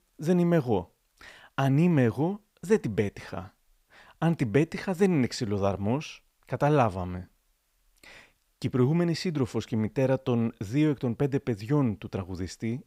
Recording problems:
none

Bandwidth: 15.5 kHz